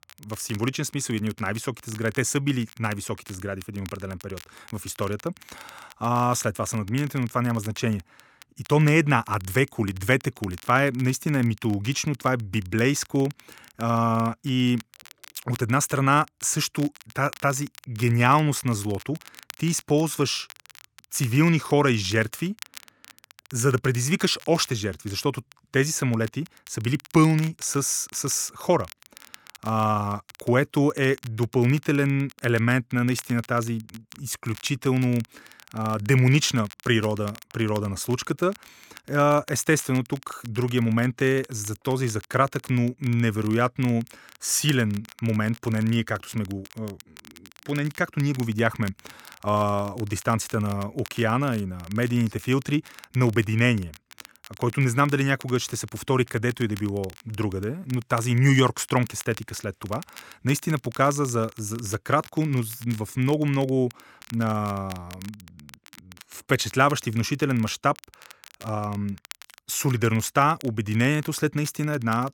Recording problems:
crackle, like an old record; faint; 20 dB below the speech

